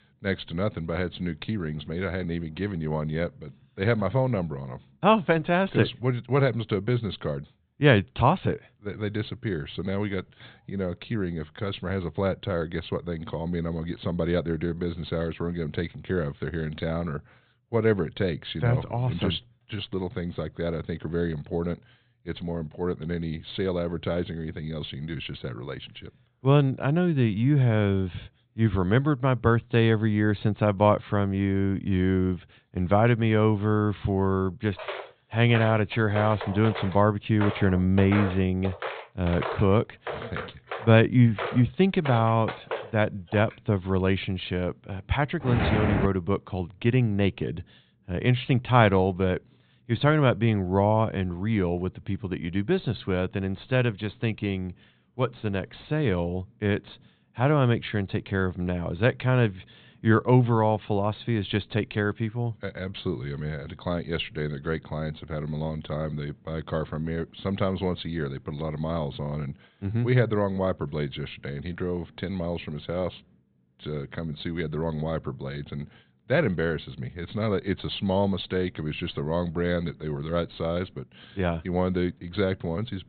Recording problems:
high frequencies cut off; severe; nothing above 4 kHz
footsteps; noticeable; from 35 to 44 s; peak 5 dB below the speech
footsteps; loud; at 45 s; peak 1 dB above the speech

